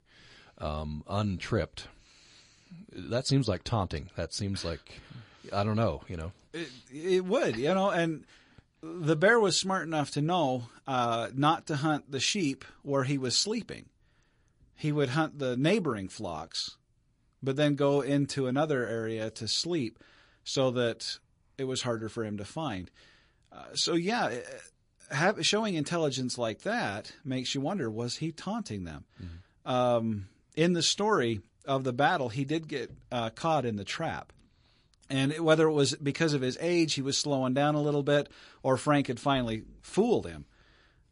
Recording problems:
garbled, watery; slightly; nothing above 10.5 kHz

